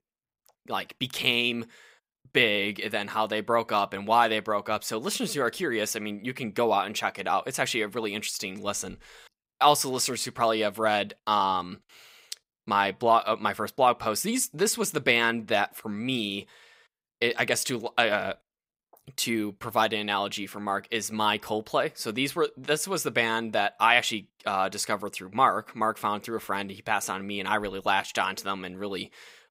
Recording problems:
none

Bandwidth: 15.5 kHz